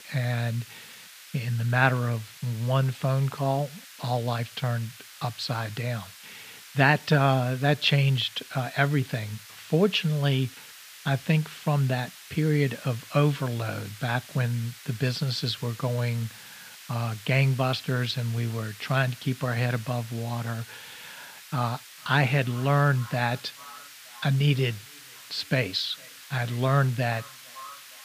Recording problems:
echo of what is said; faint; from 22 s on; 450 ms later, 25 dB below the speech
muffled; very slightly; fading above 4 kHz
hiss; noticeable; throughout; 15 dB below the speech

